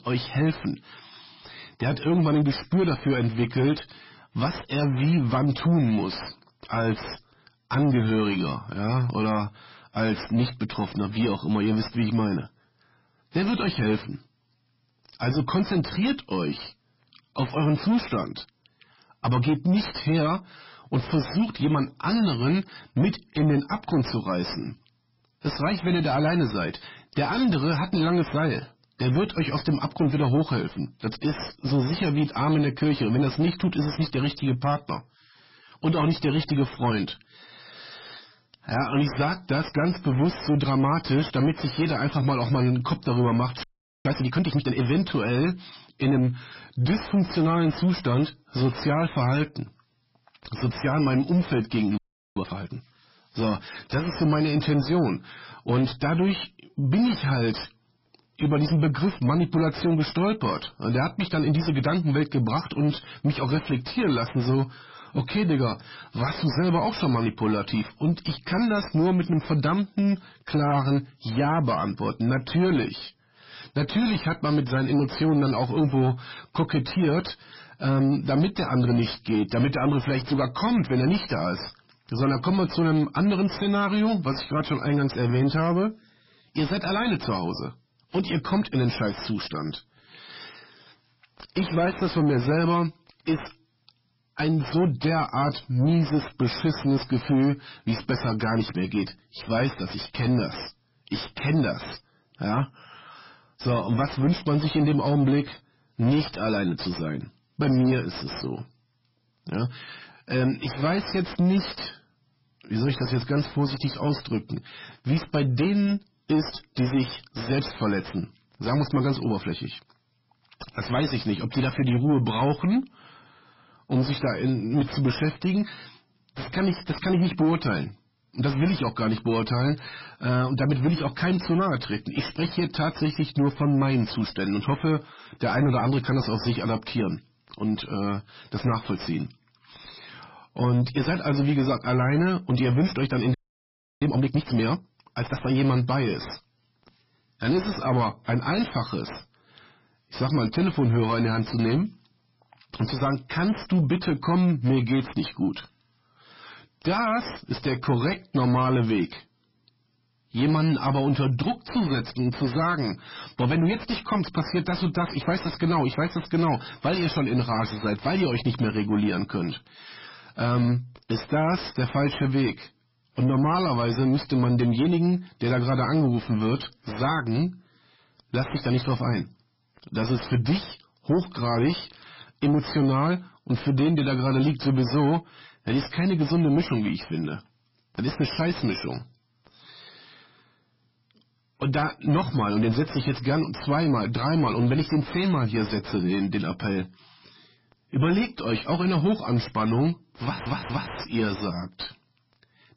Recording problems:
distortion; heavy; 7 dB below the speech
garbled, watery; badly; nothing above 5.5 kHz
audio freezing; at 44 s, at 52 s and at 2:23 for 0.5 s
audio stuttering; at 3:20

